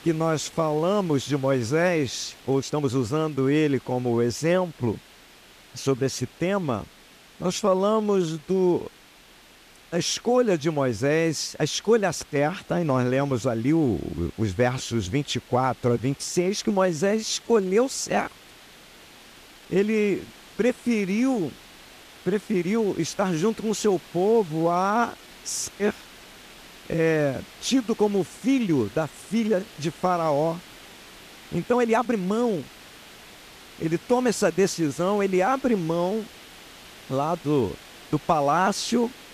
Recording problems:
hiss; faint; throughout; 20 dB below the speech
uneven, jittery; strongly; from 0.5 to 33 s

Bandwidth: 14.5 kHz